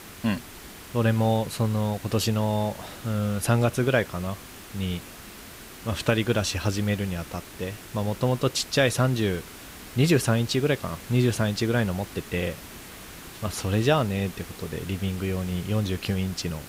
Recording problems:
hiss; noticeable; throughout; 15 dB below the speech

